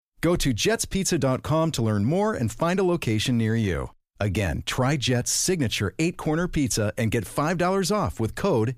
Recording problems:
none

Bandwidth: 15 kHz